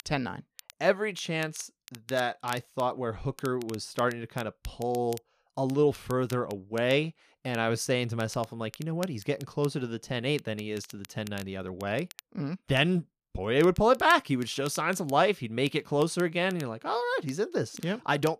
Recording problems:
crackle, like an old record; faint; 20 dB below the speech

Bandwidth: 14.5 kHz